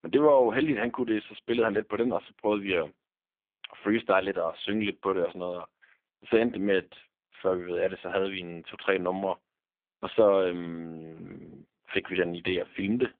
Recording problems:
phone-call audio; poor line; nothing above 3.5 kHz

